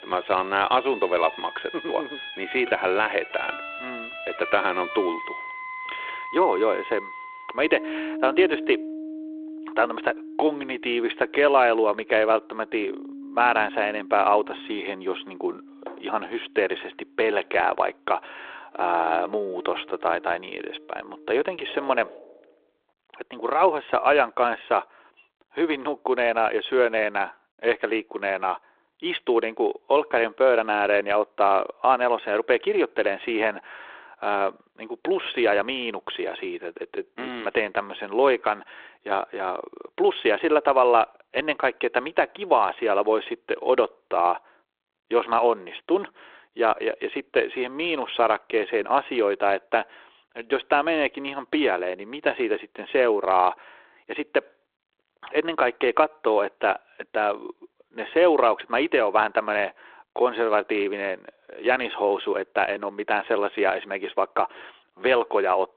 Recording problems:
phone-call audio
background music; noticeable; until 22 s; 10 dB below the speech

